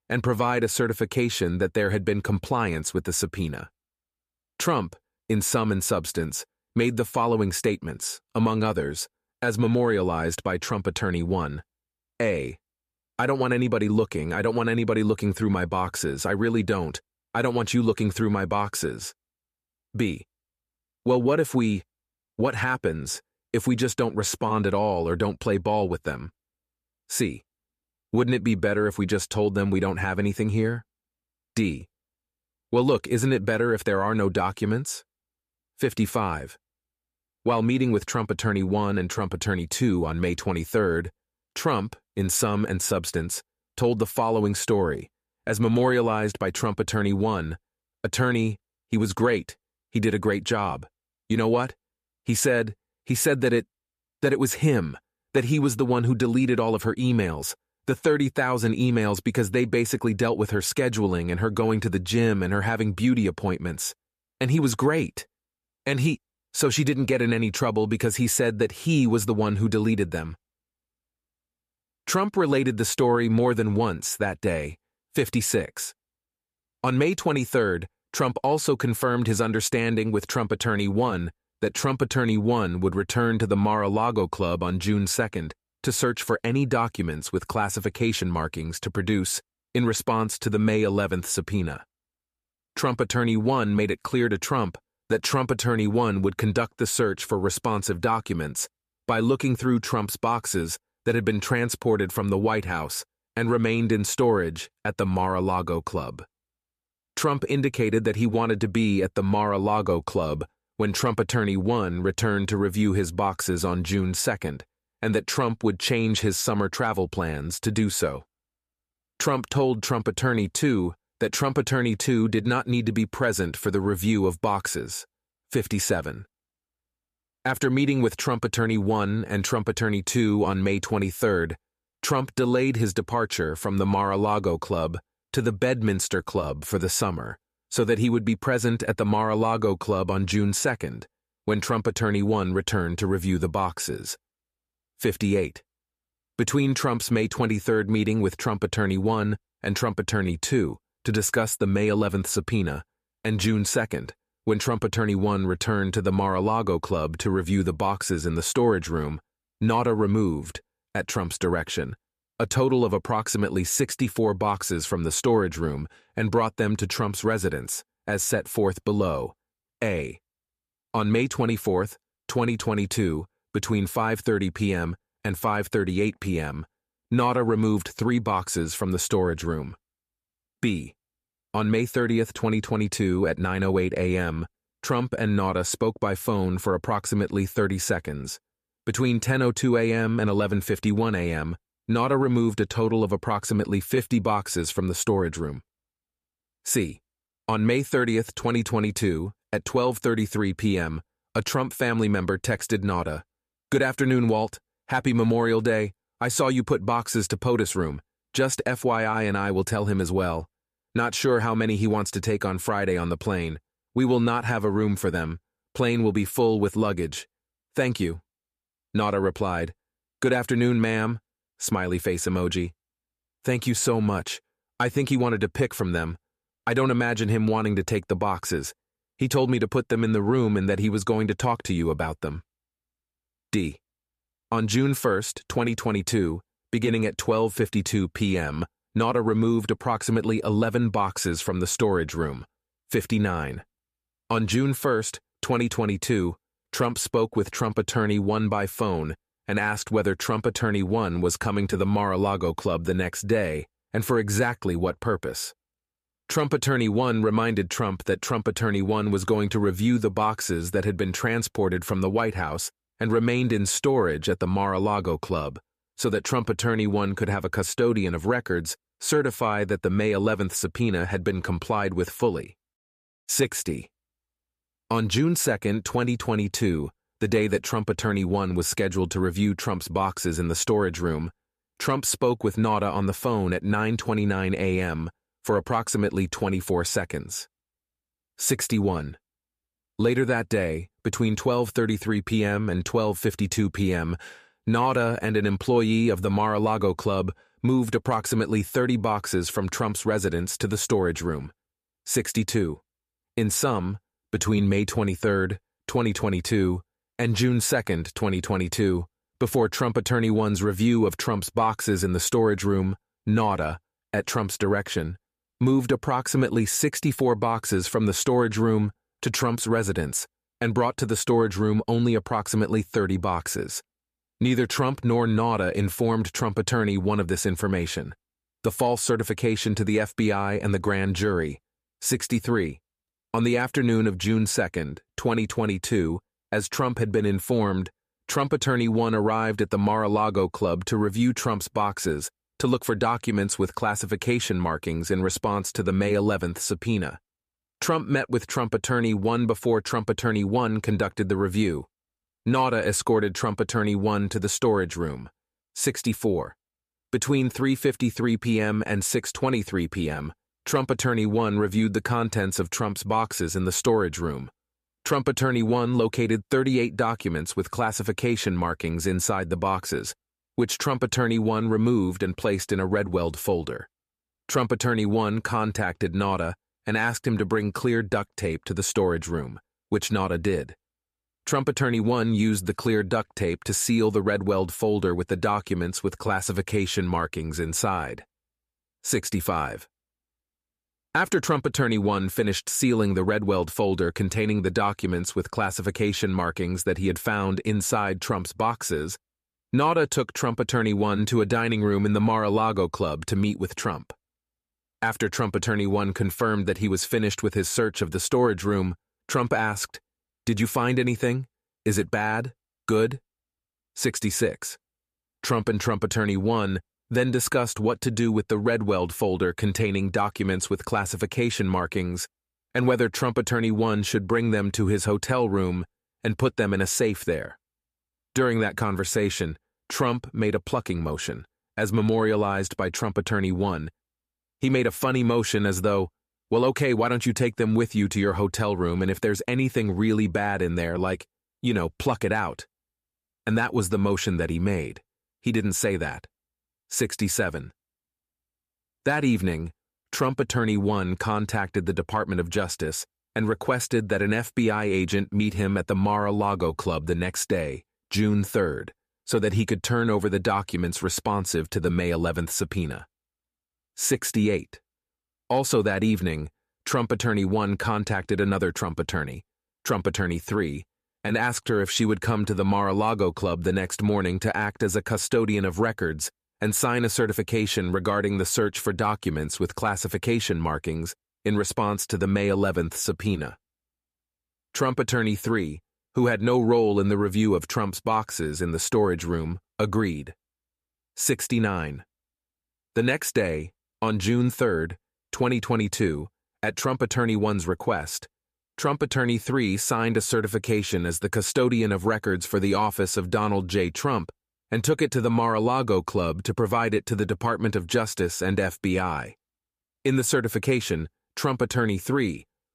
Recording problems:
none

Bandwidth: 14.5 kHz